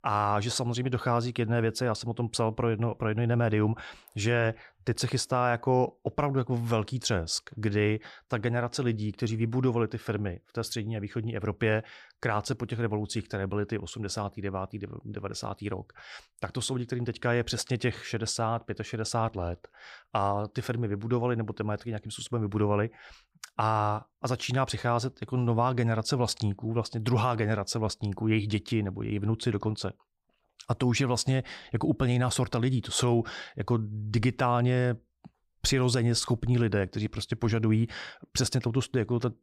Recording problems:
none

